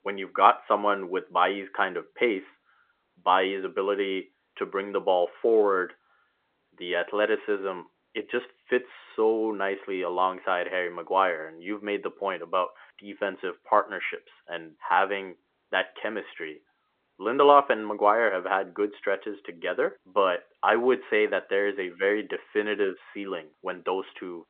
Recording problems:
phone-call audio; nothing above 3.5 kHz
muffled; very slightly; fading above 2 kHz

